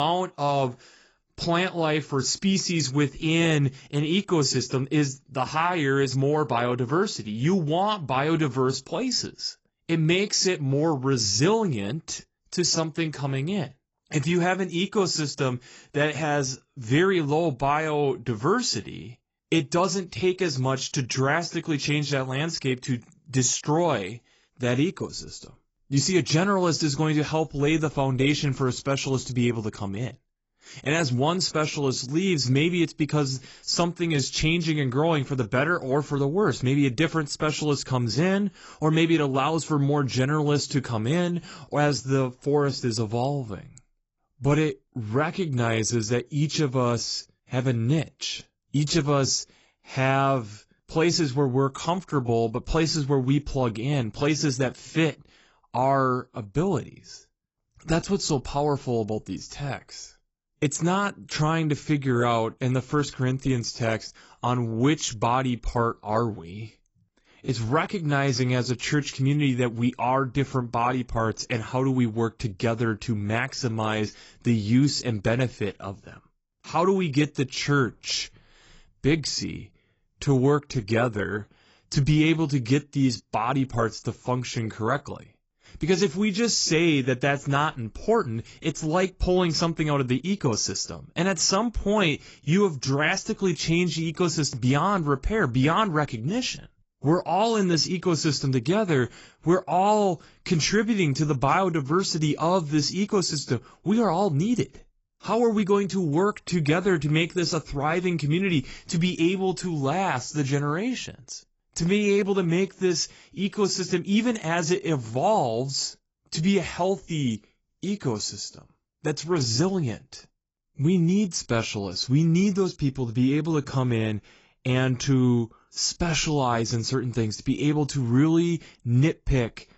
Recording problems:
garbled, watery; badly; nothing above 7.5 kHz
abrupt cut into speech; at the start

